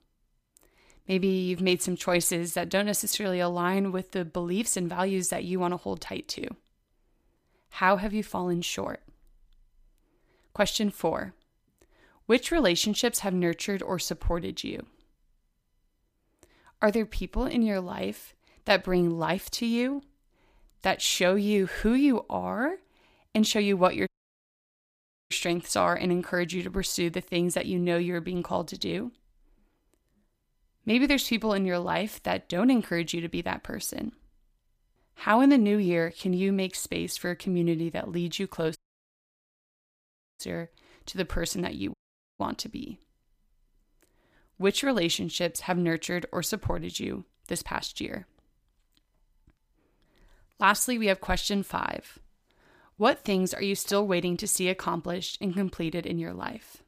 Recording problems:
audio cutting out; at 24 s for 1 s, at 39 s for 1.5 s and at 42 s

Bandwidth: 15 kHz